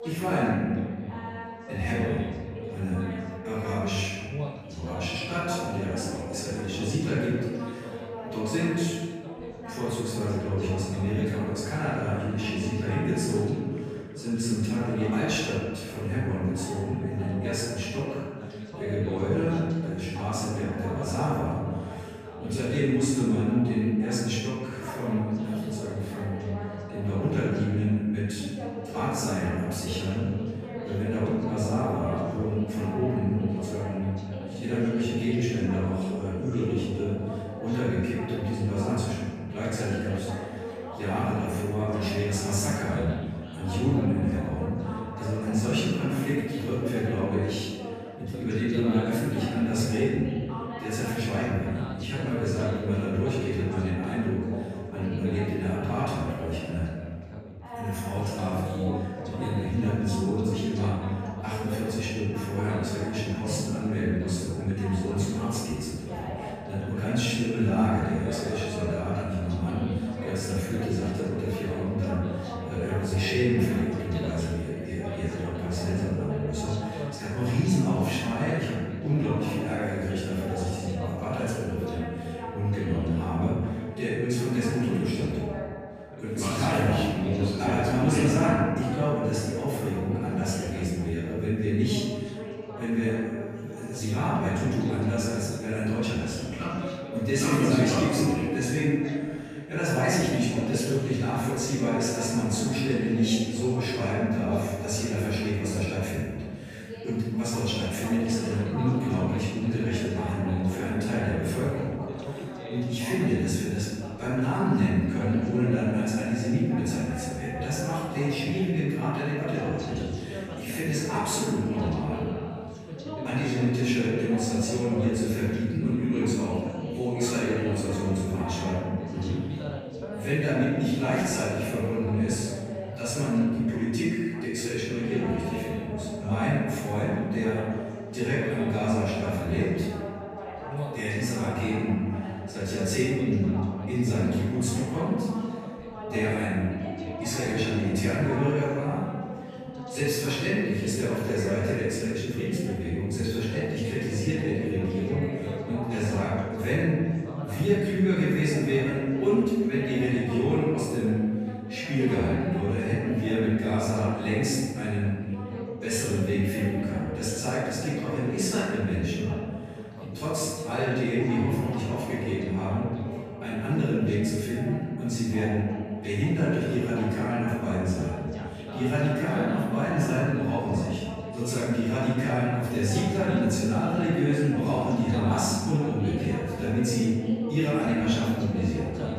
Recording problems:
room echo; strong; dies away in 1.4 s
off-mic speech; far
background chatter; loud; throughout; 3 voices, 10 dB below the speech

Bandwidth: 15 kHz